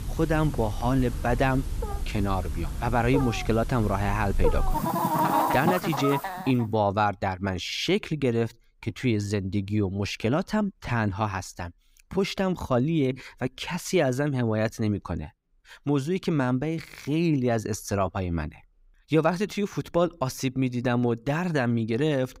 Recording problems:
animal sounds; loud; until 6 s; 3 dB below the speech

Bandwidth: 15.5 kHz